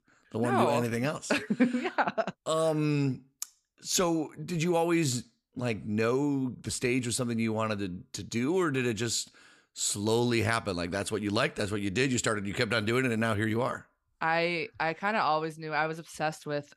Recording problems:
none

